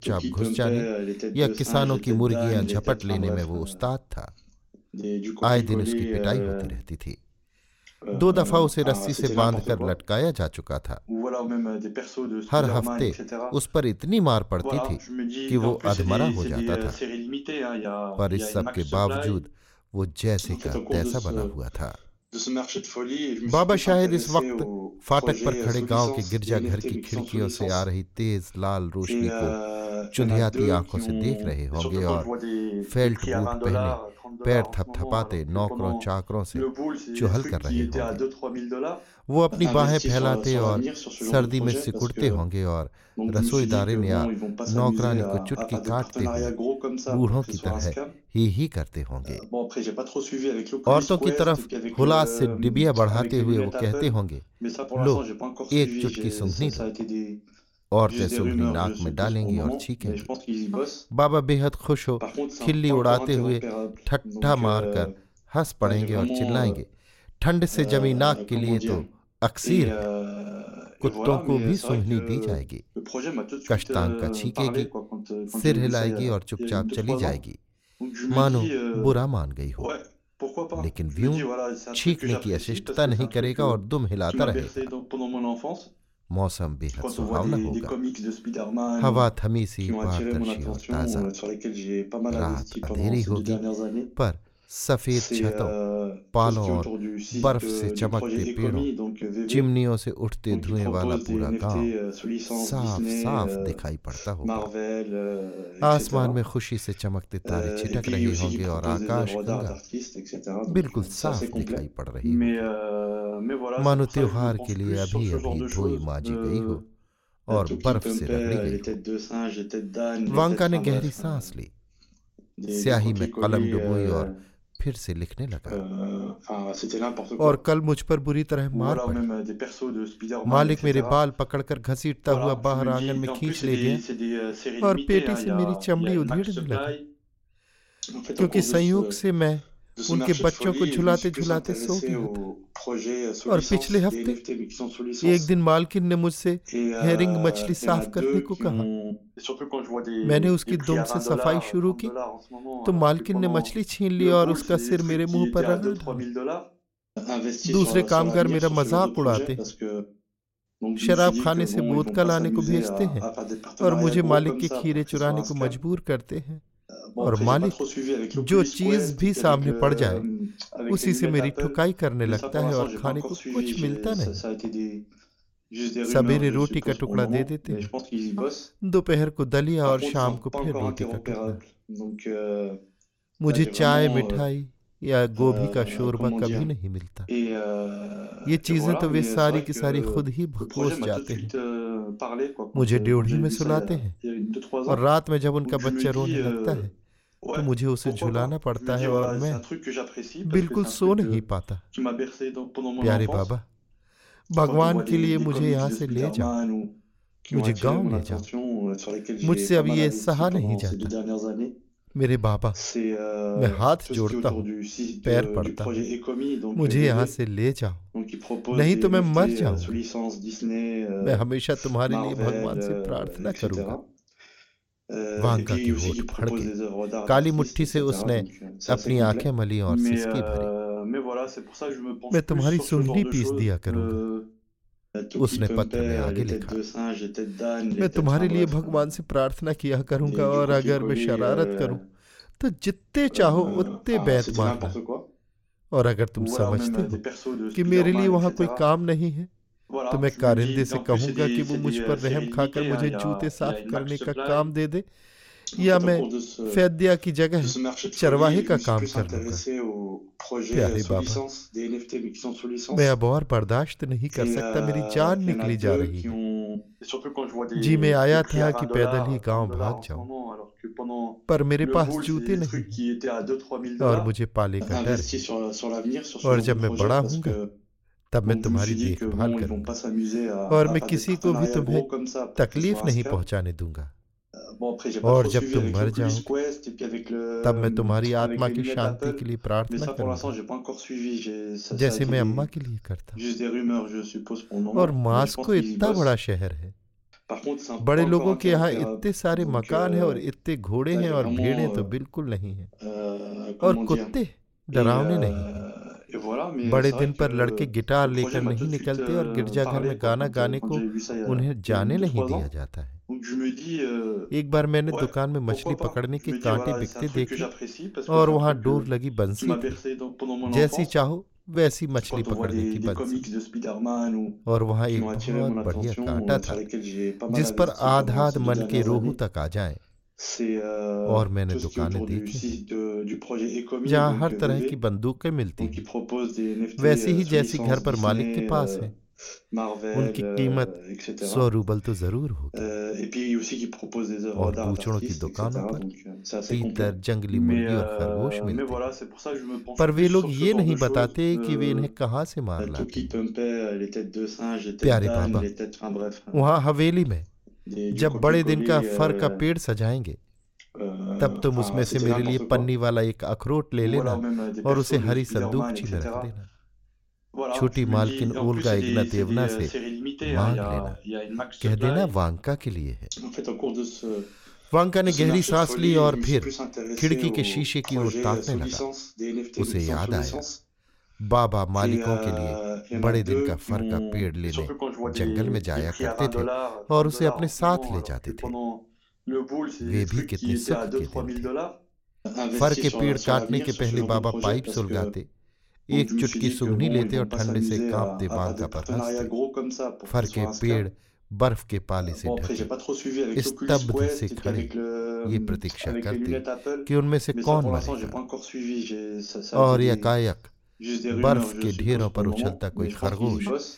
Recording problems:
voice in the background; loud; throughout; 5 dB below the speech

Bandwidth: 16.5 kHz